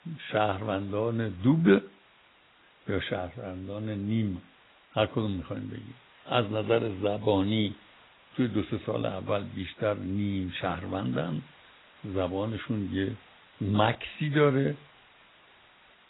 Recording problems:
garbled, watery; badly; nothing above 4 kHz
hiss; faint; throughout; 25 dB below the speech

